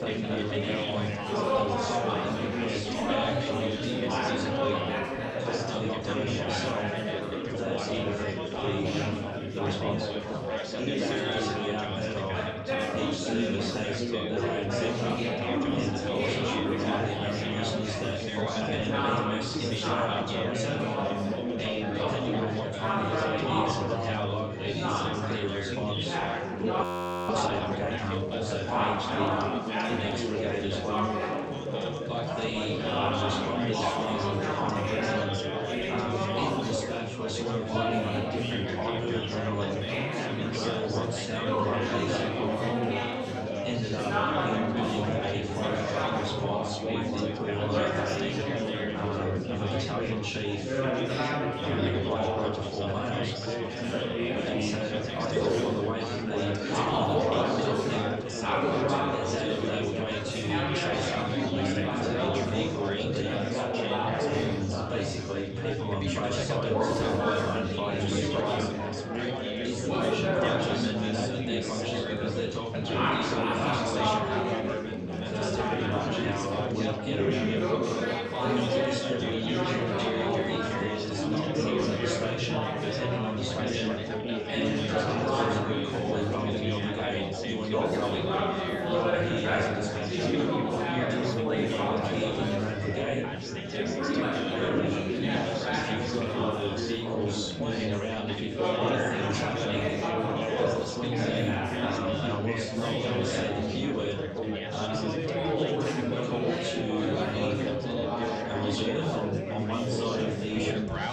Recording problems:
room echo; strong; dies away in 1.5 s
off-mic speech; far
chatter from many people; very loud; throughout; 2 dB above the speech
crowd noise; faint; throughout; 20 dB below the speech
audio freezing; at 27 s

